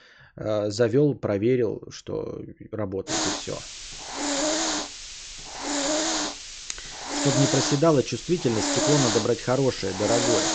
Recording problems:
high frequencies cut off; noticeable; nothing above 8 kHz
hiss; loud; from 3 s on; 2 dB below the speech

